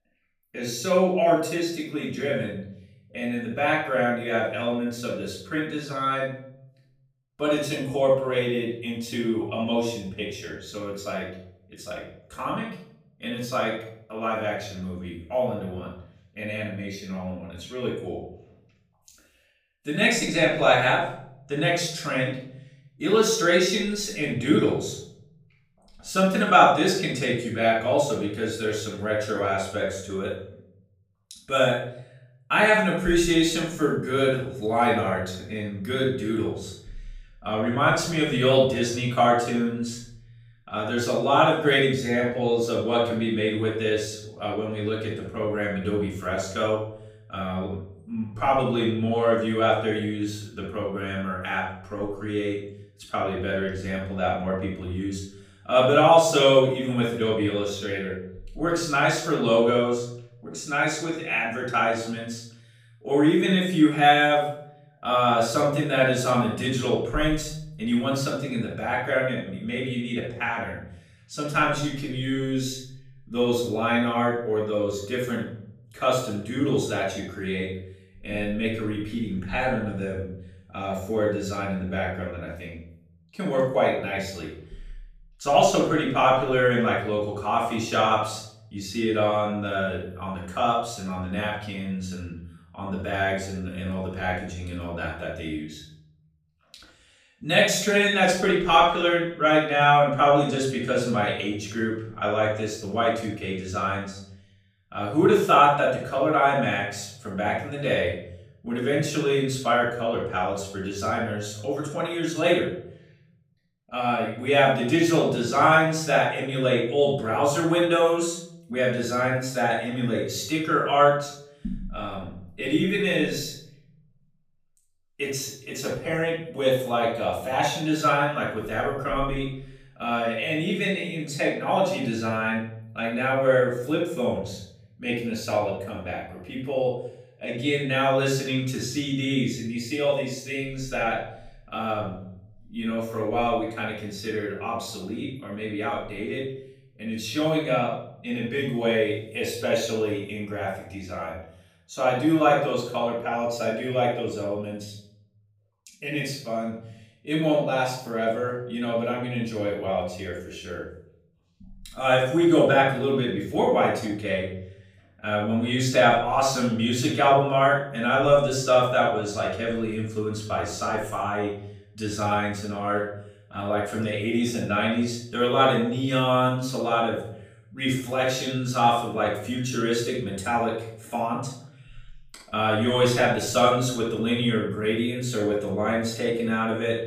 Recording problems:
off-mic speech; far
room echo; noticeable; dies away in 0.7 s

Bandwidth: 15 kHz